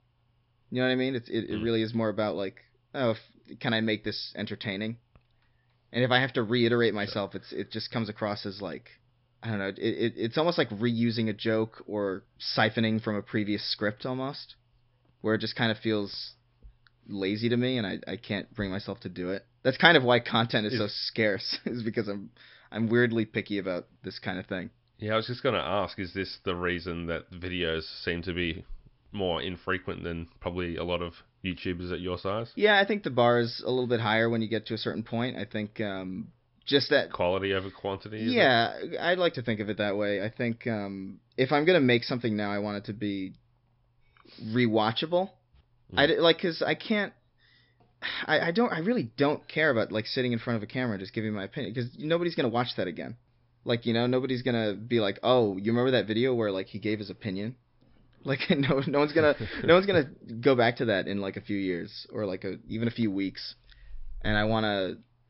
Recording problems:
high frequencies cut off; noticeable; nothing above 5.5 kHz

